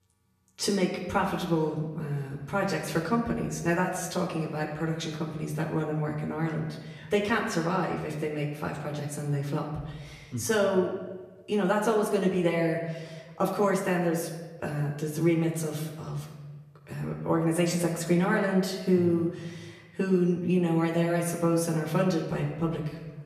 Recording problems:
off-mic speech; far
room echo; slight; dies away in 1.1 s

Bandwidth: 14.5 kHz